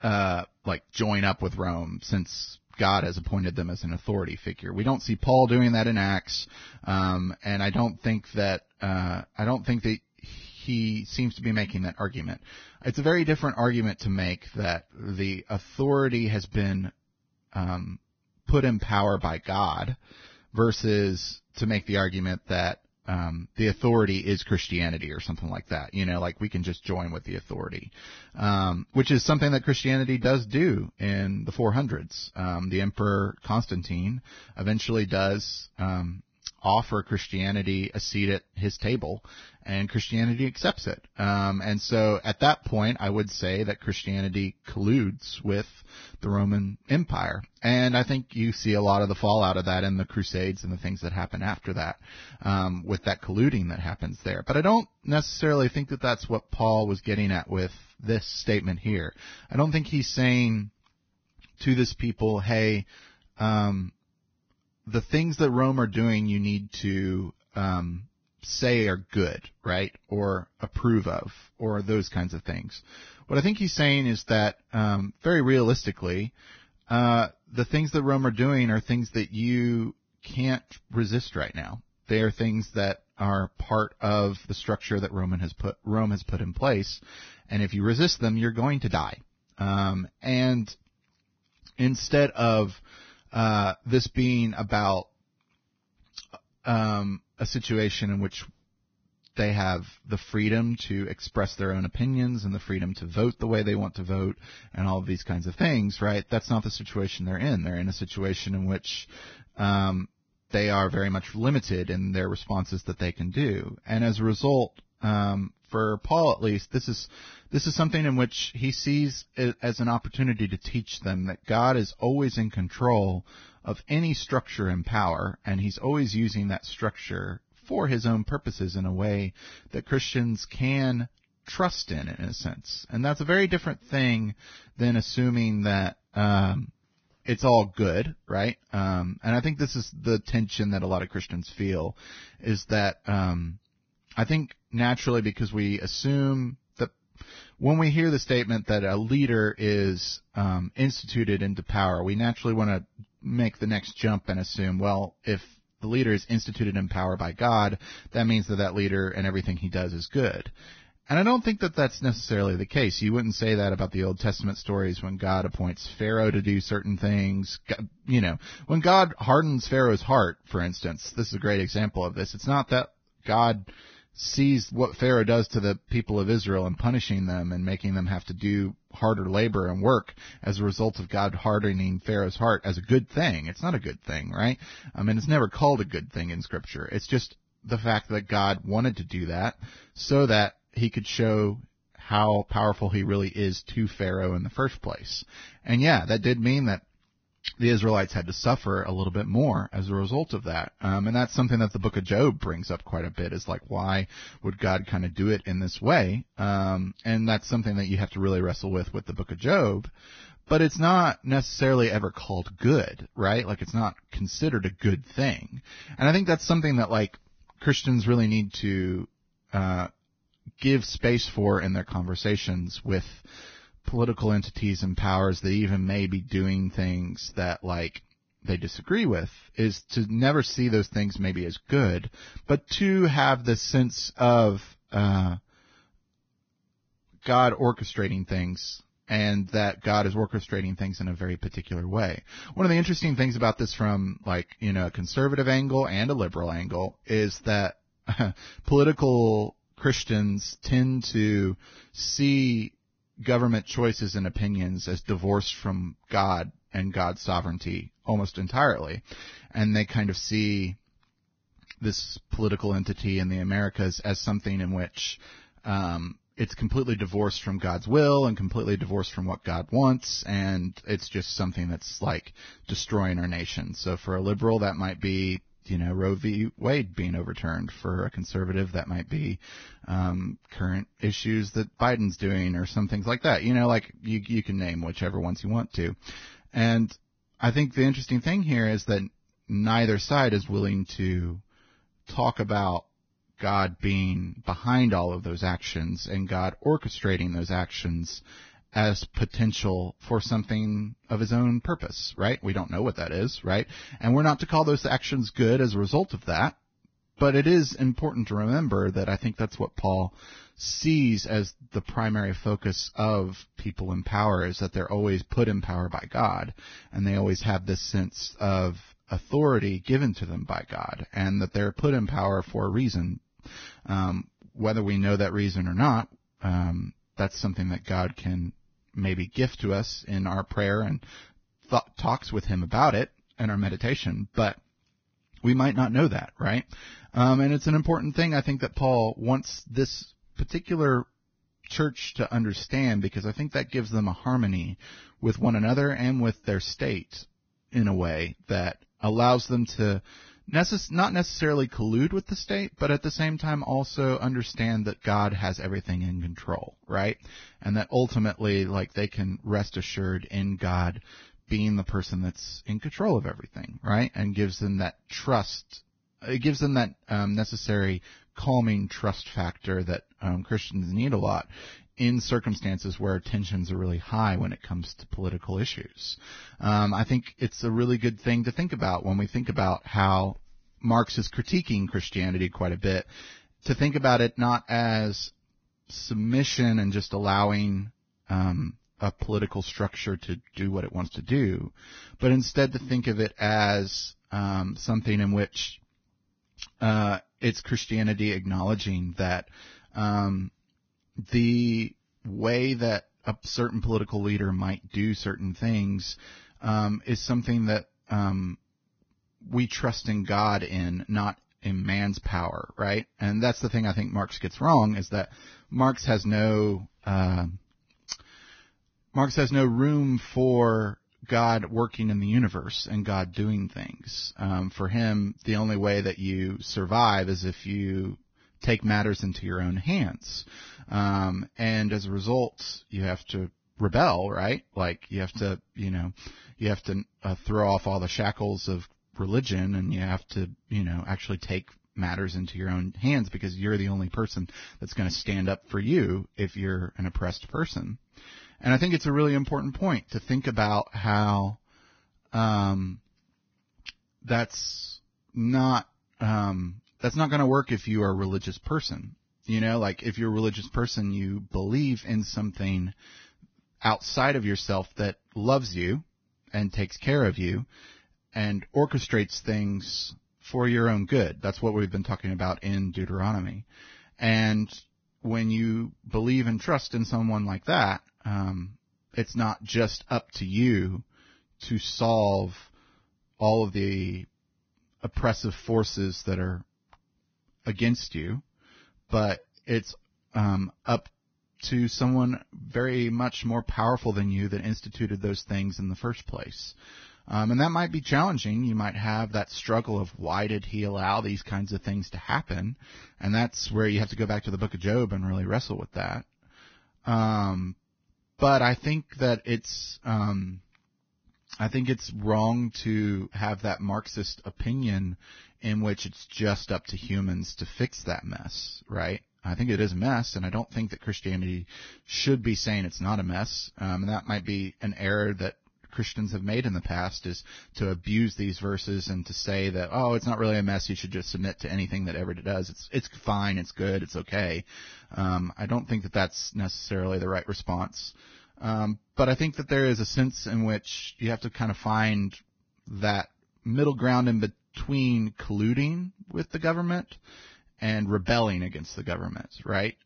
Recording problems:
garbled, watery; badly; nothing above 6 kHz

